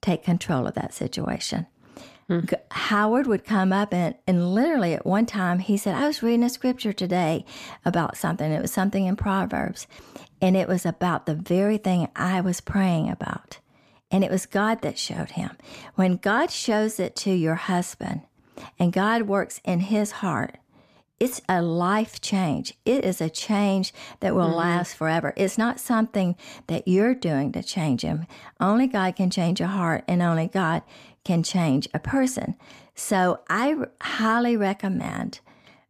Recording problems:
none

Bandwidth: 14.5 kHz